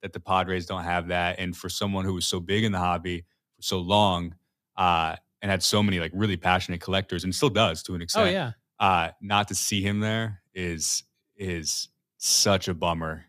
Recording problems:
none

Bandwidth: 14.5 kHz